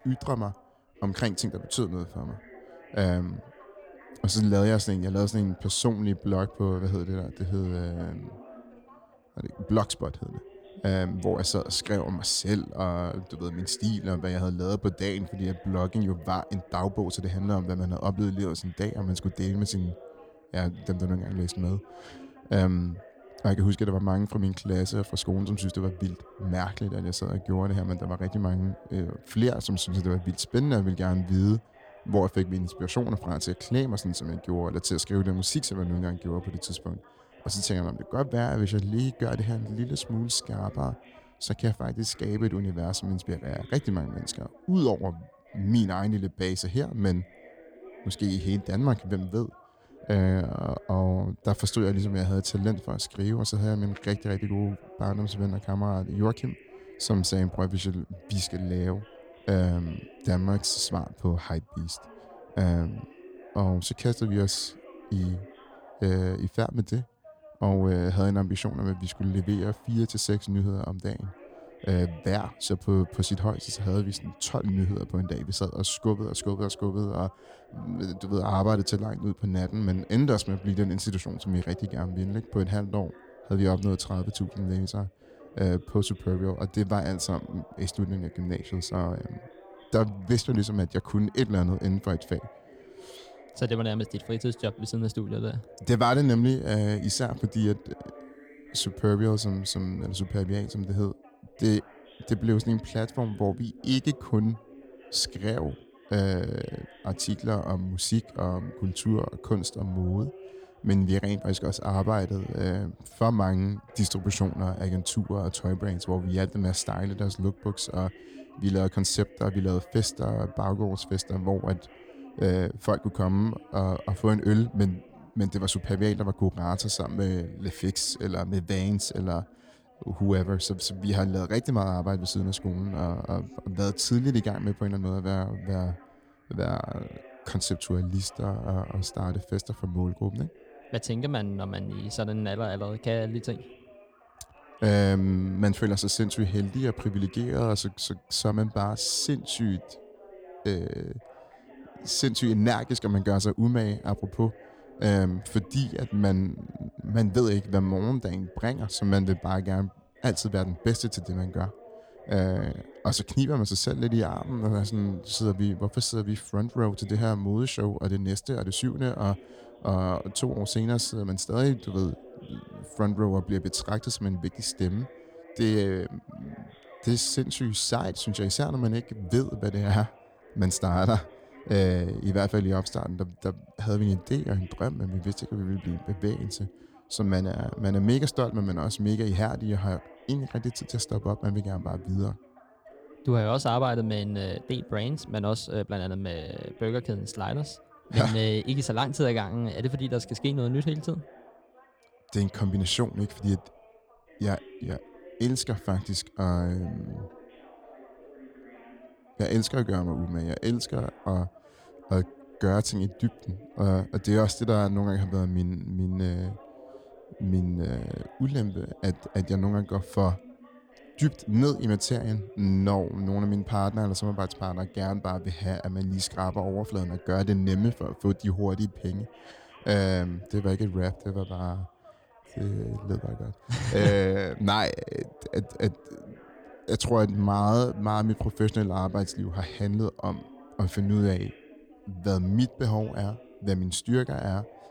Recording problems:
background chatter; faint; throughout; 2 voices, 20 dB below the speech

